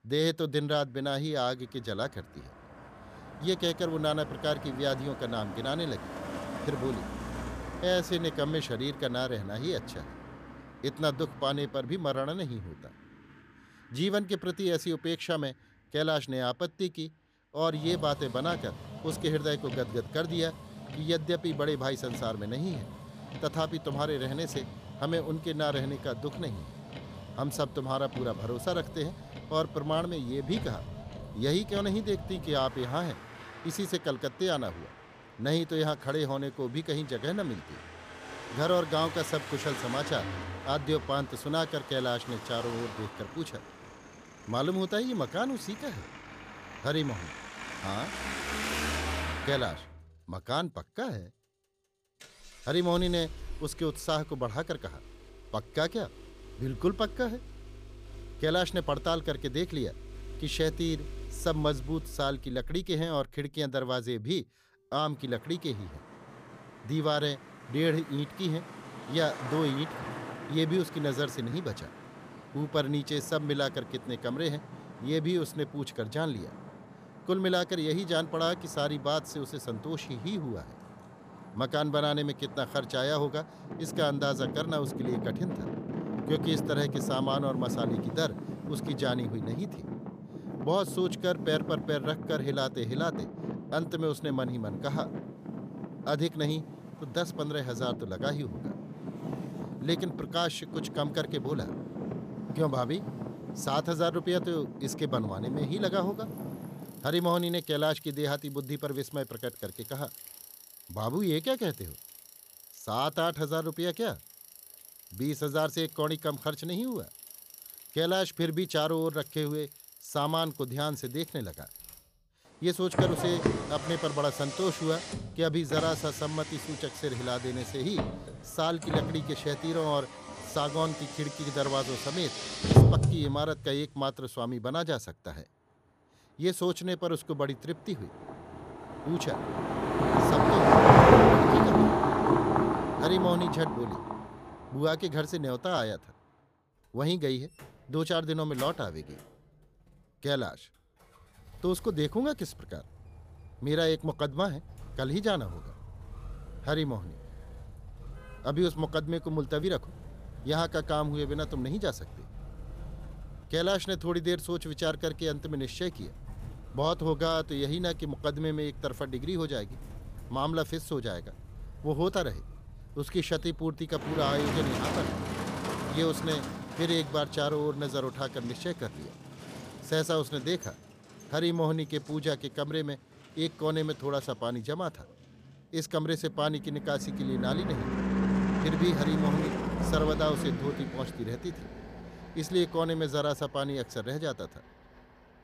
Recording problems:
traffic noise; loud; throughout; 1 dB below the speech

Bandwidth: 15 kHz